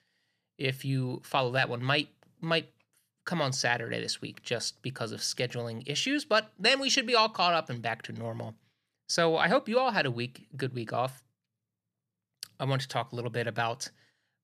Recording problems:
none

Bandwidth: 14.5 kHz